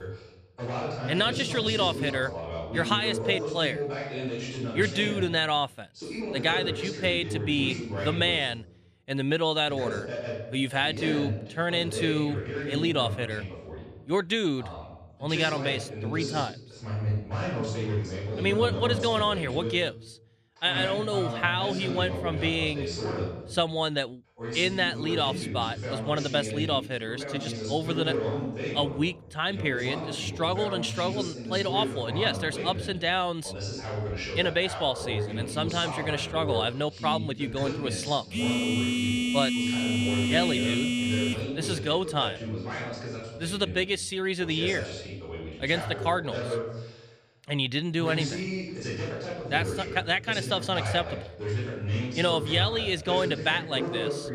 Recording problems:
voice in the background; loud; throughout; 6 dB below the speech
phone ringing; loud; from 38 to 41 s; peak 2 dB above the speech

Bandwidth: 15 kHz